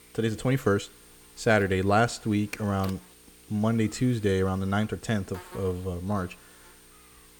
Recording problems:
electrical hum; faint; throughout; 60 Hz, 20 dB below the speech

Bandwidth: 18 kHz